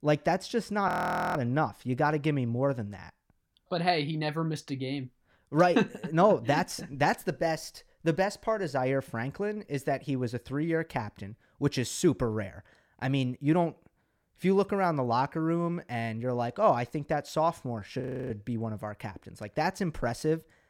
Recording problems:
audio freezing; at 1 s and at 18 s

